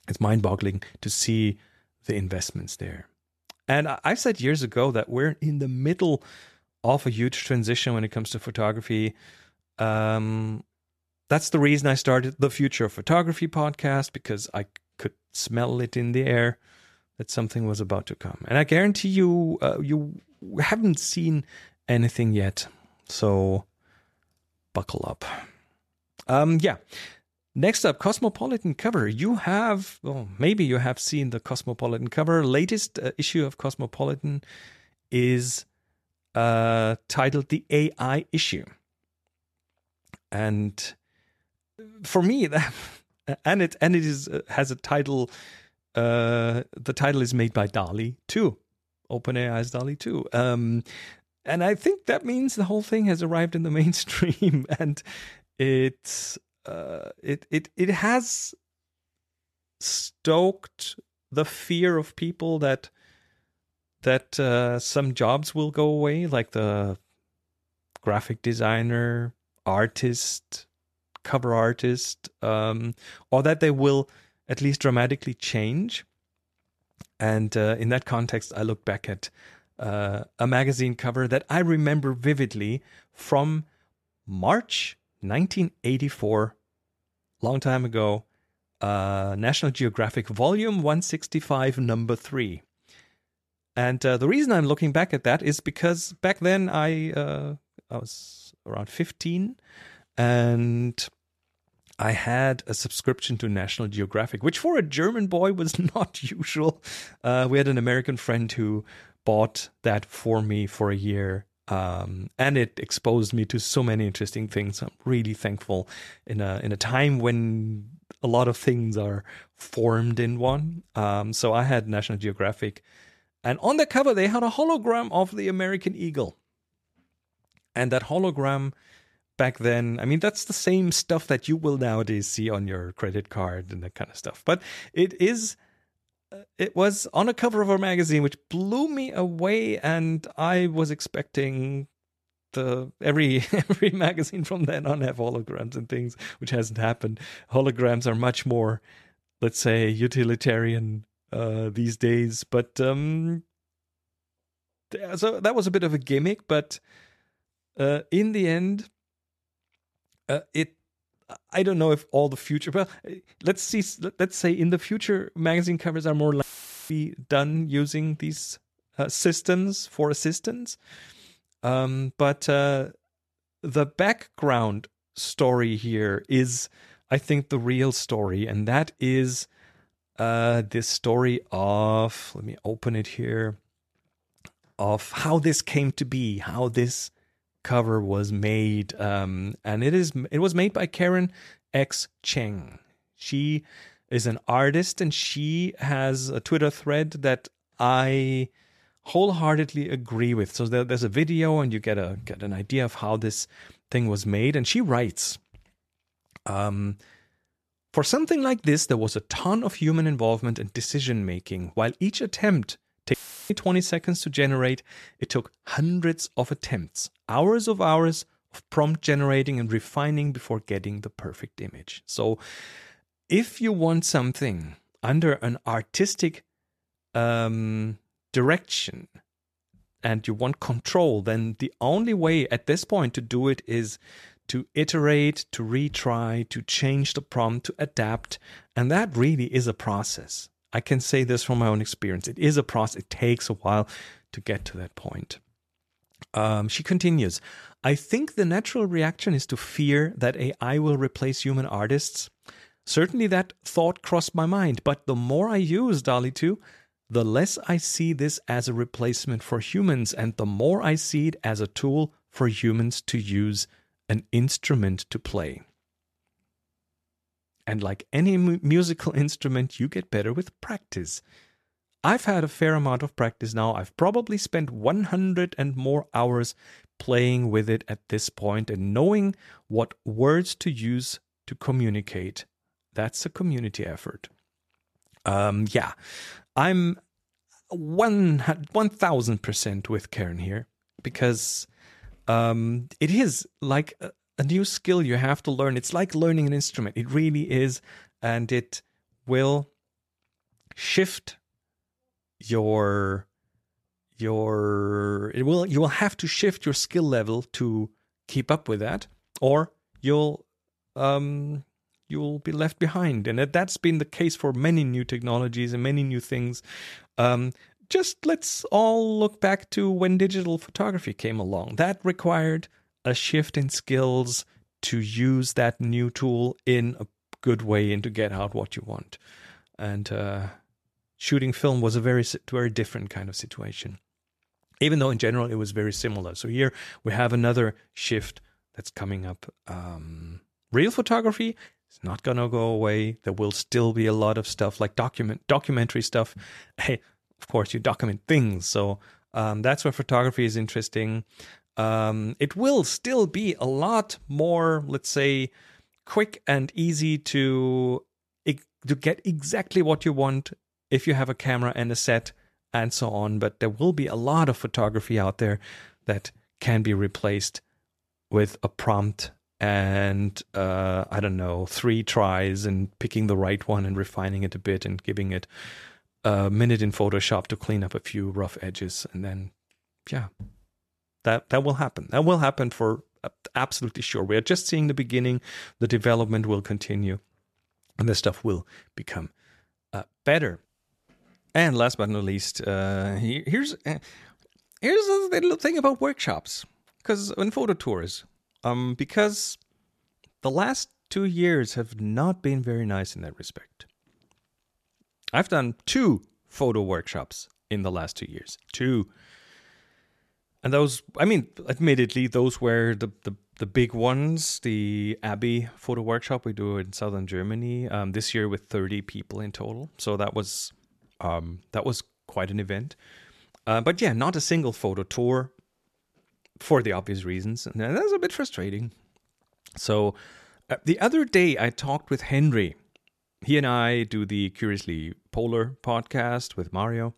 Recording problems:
audio cutting out; filled with static; at 2:46 and at 3:33

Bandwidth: 13.5 kHz